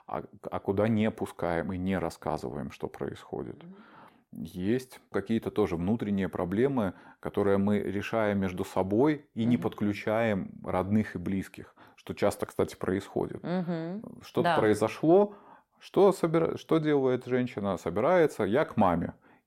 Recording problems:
none

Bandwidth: 16.5 kHz